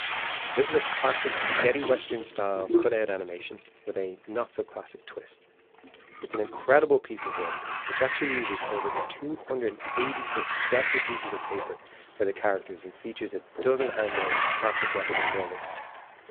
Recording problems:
phone-call audio; poor line
household noises; very loud; throughout; 1 dB above the speech

